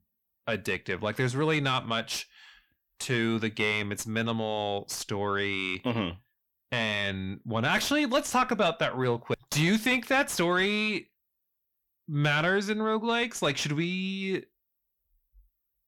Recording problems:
distortion; slight; 10 dB below the speech

